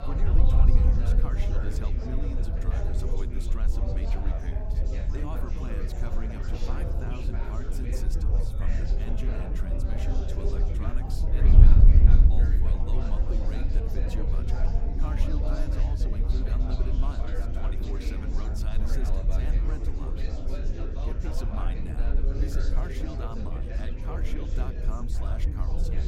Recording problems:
chatter from many people; very loud; throughout; 1 dB above the speech
wind noise on the microphone; heavy; 1 dB below the speech

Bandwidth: 16 kHz